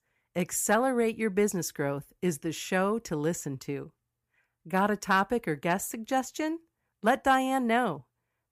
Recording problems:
none

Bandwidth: 15 kHz